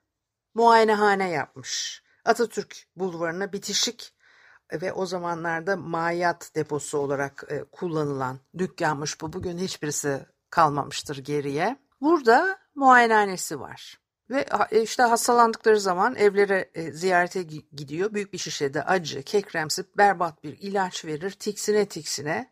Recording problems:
uneven, jittery; slightly; from 10 to 20 s

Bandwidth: 15 kHz